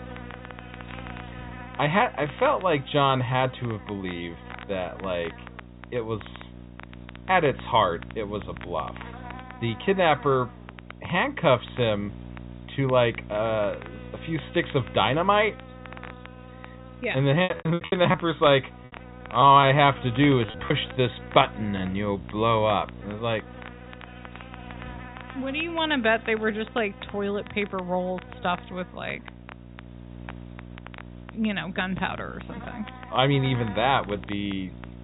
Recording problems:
high frequencies cut off; severe; nothing above 4 kHz
electrical hum; faint; throughout; 60 Hz, 20 dB below the speech
crackle, like an old record; faint; 20 dB below the speech
choppy; very; from 17 to 21 s; 14% of the speech affected

